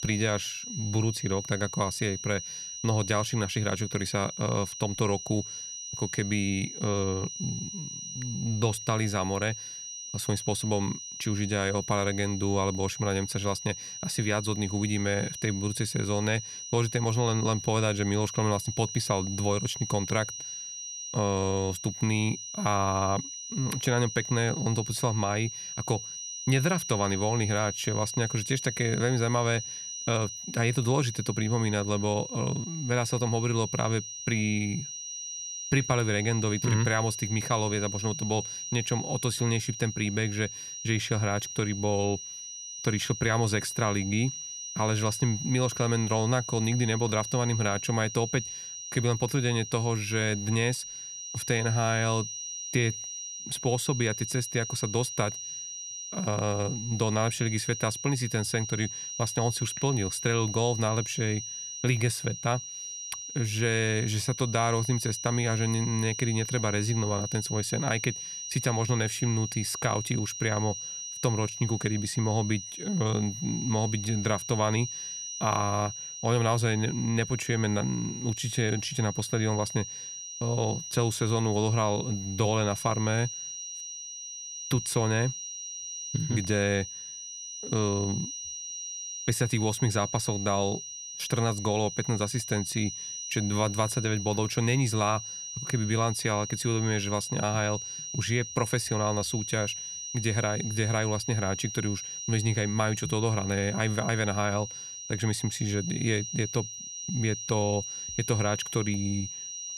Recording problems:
high-pitched whine; loud; throughout; 6 kHz, 7 dB below the speech

